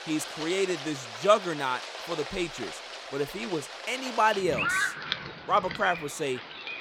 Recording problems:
rain or running water; loud; throughout; 6 dB below the speech

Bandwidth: 17 kHz